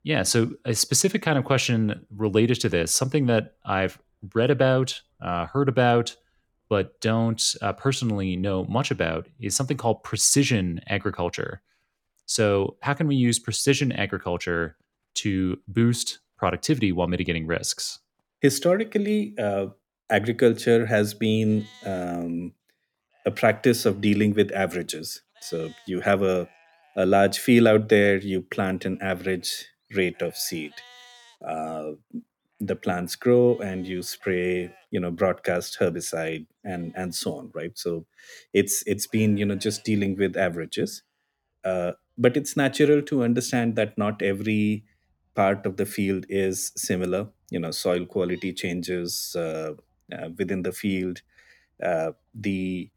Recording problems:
animal sounds; faint; throughout; 30 dB below the speech

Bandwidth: 18 kHz